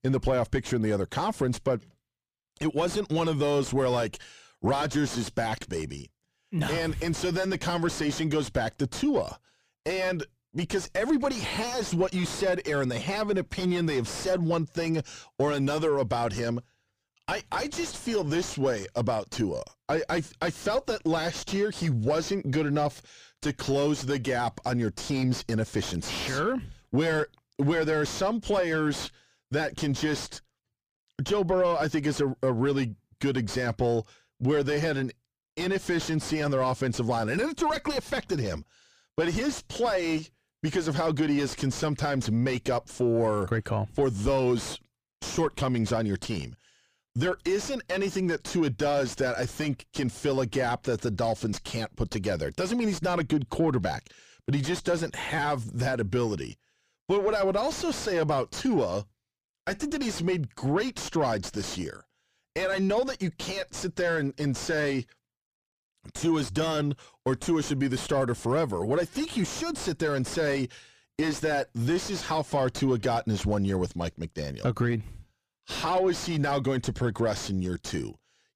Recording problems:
distortion; heavy; 5 dB below the speech

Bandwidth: 15 kHz